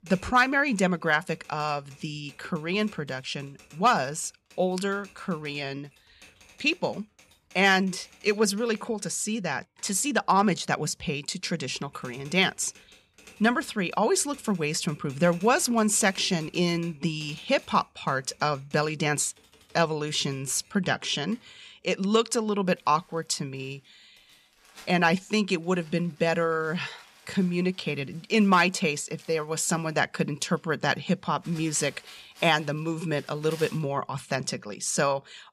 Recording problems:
household noises; faint; throughout; 25 dB below the speech

